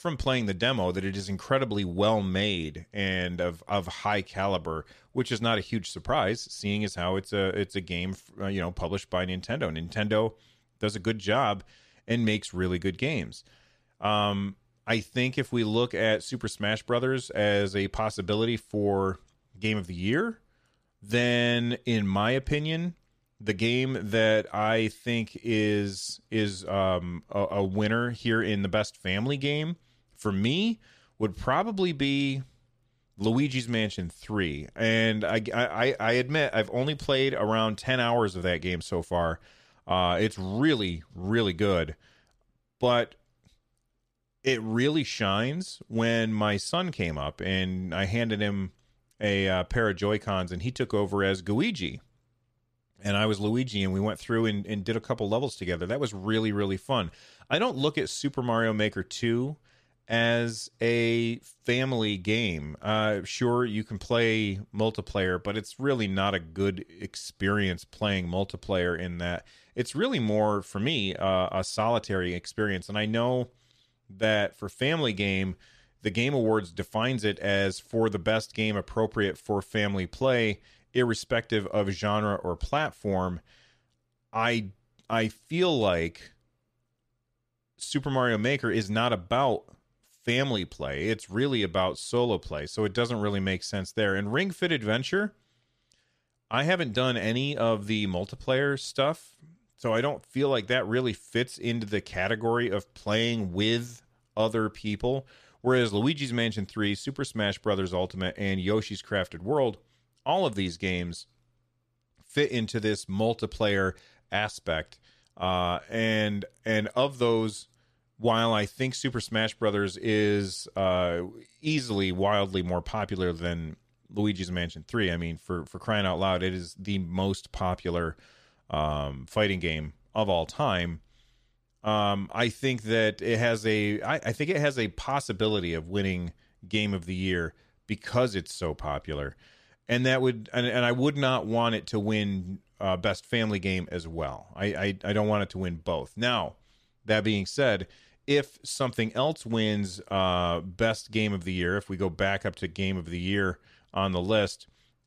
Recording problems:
none

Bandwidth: 14.5 kHz